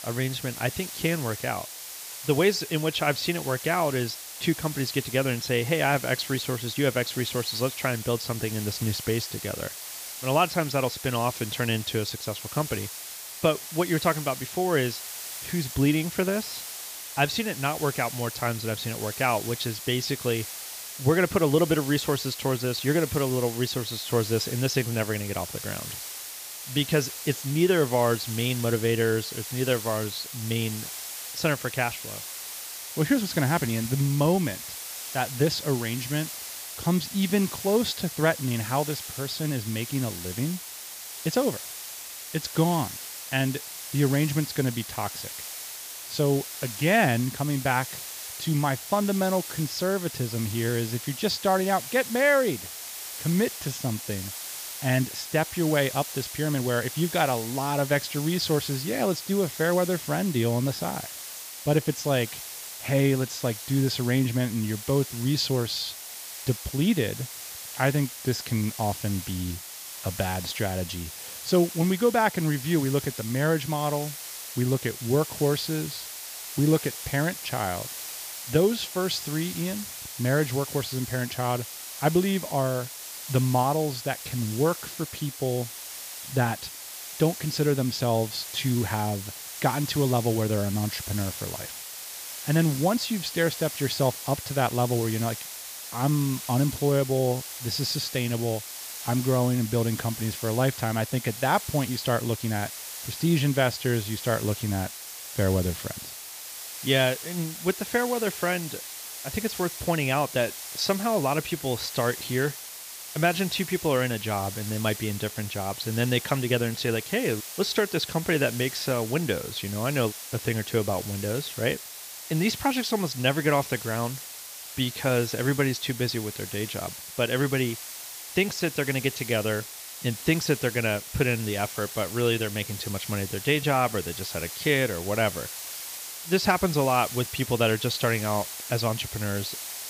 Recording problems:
high frequencies cut off; noticeable; nothing above 8 kHz
hiss; loud; throughout; 9 dB below the speech

